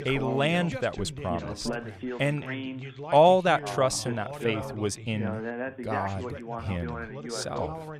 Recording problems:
background chatter; loud; throughout; 2 voices, 9 dB below the speech

